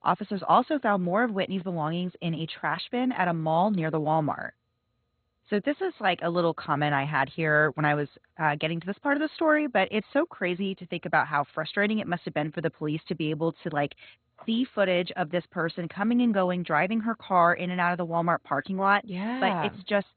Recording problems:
garbled, watery; badly; nothing above 4 kHz

